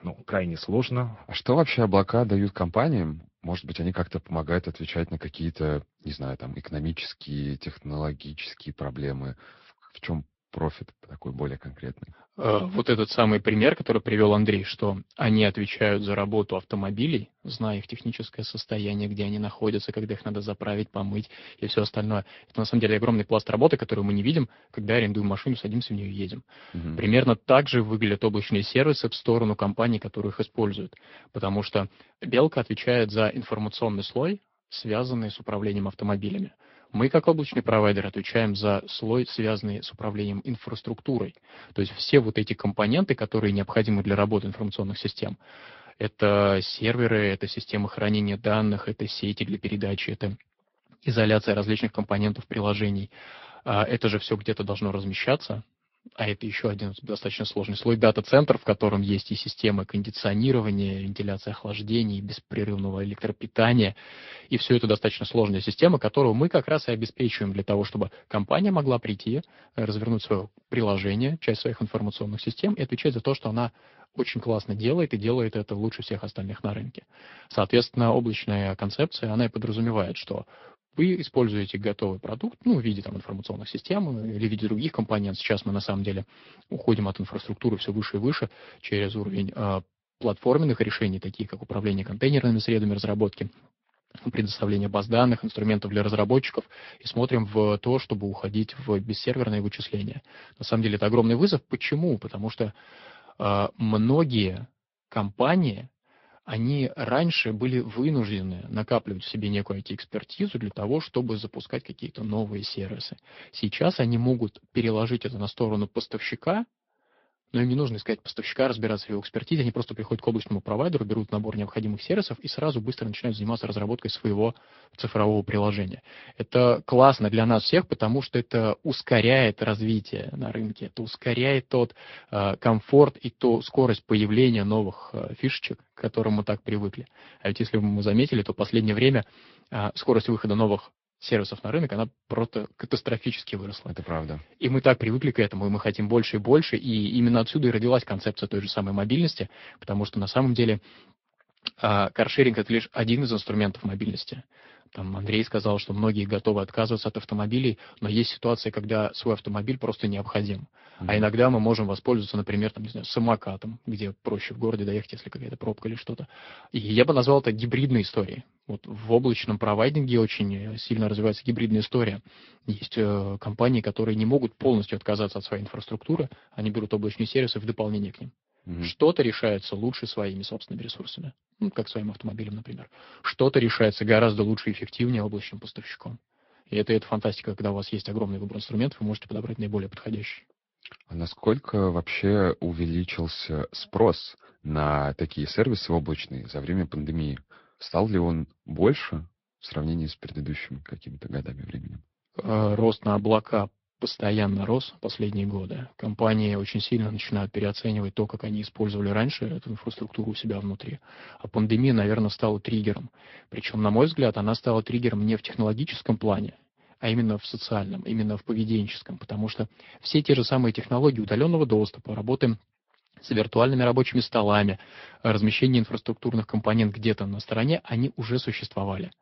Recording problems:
high frequencies cut off; noticeable; nothing above 5.5 kHz
garbled, watery; slightly

